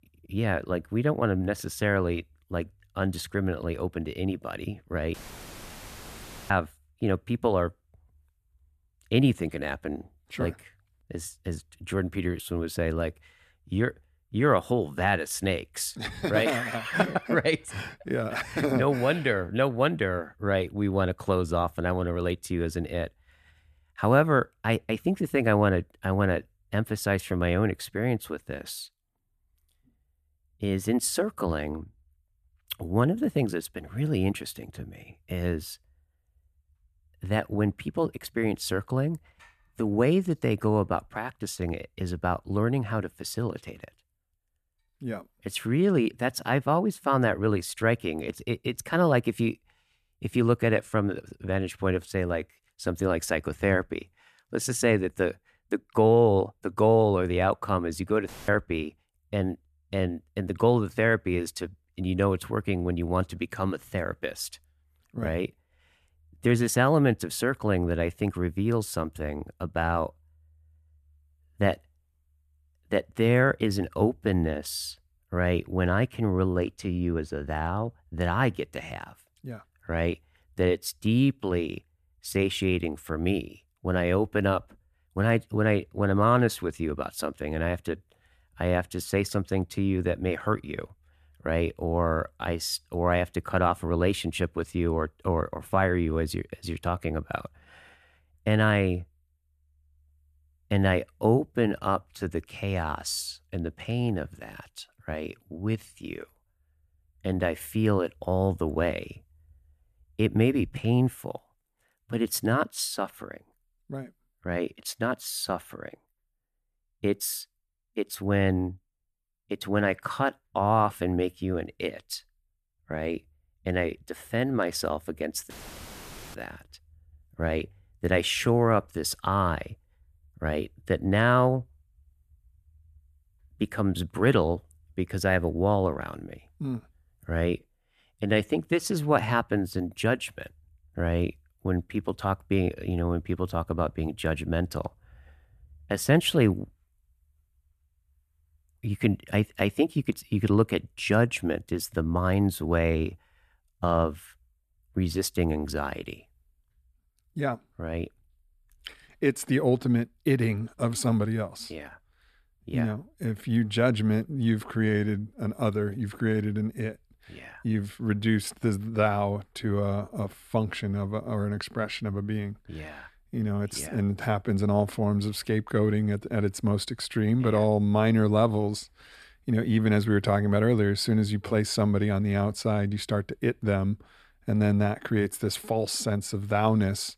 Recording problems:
audio cutting out; filled with static; at 5 s for 1.5 s, at 58 s and at 2:06 for 1 s

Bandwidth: 14.5 kHz